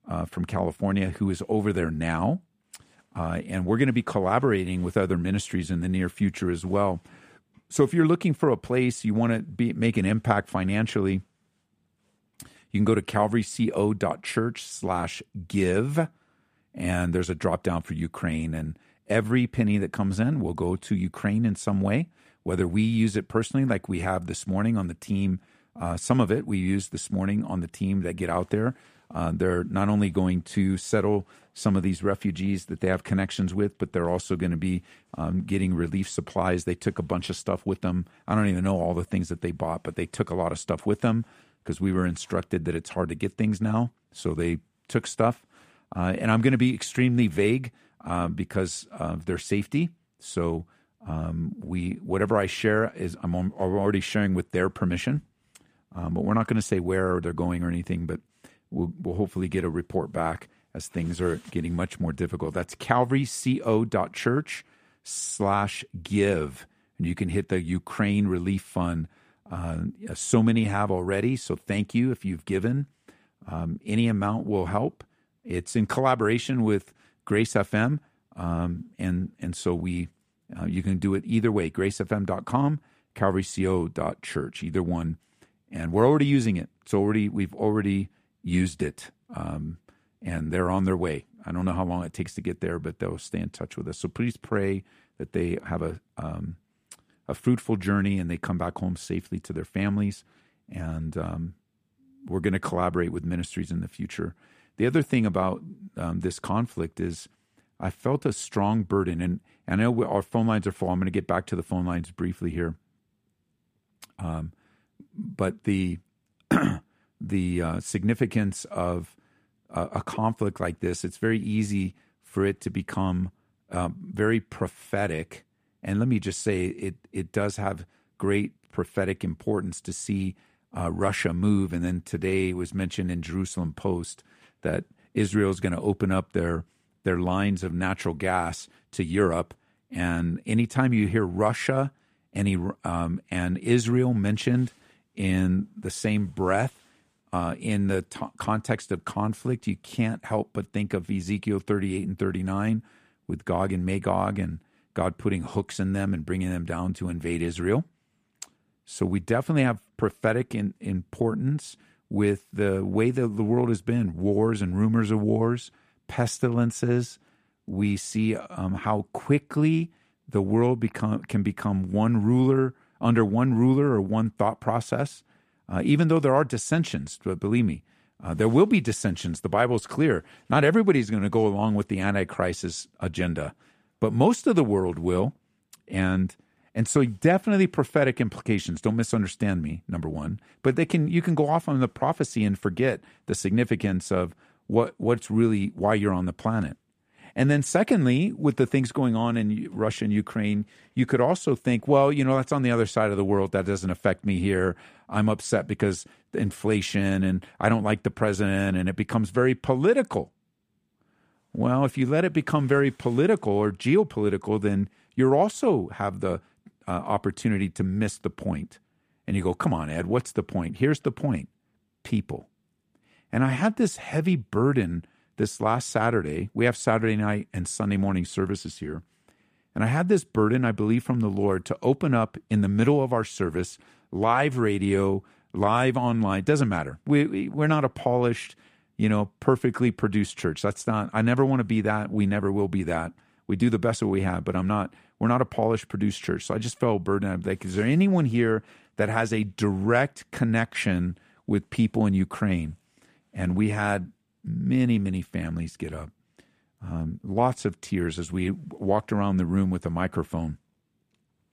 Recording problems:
none

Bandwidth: 15 kHz